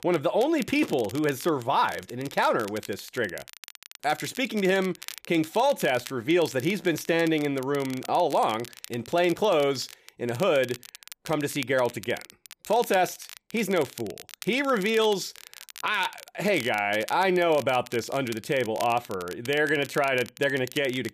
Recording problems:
crackle, like an old record; noticeable; 15 dB below the speech

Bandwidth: 14.5 kHz